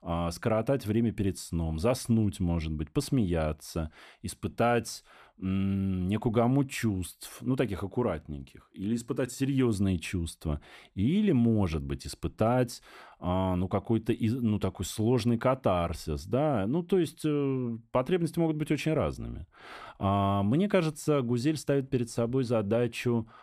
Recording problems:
none

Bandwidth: 14.5 kHz